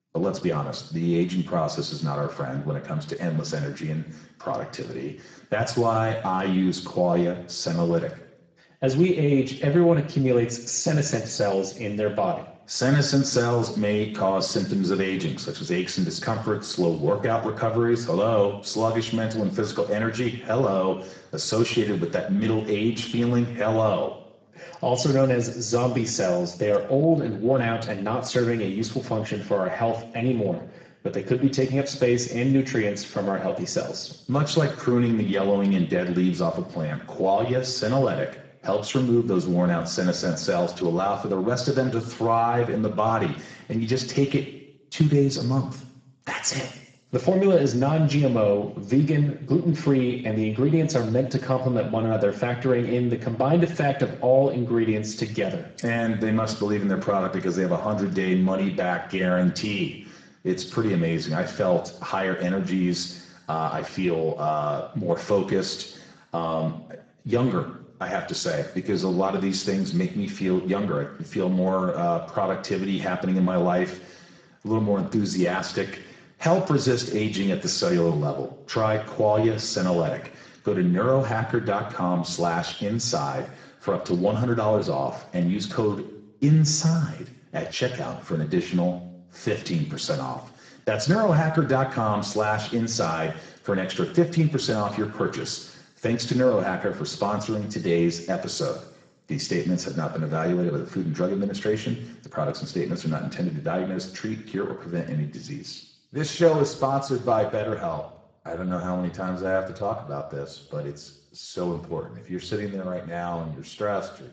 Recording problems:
garbled, watery; badly; nothing above 7.5 kHz
room echo; slight; dies away in 0.7 s
off-mic speech; somewhat distant

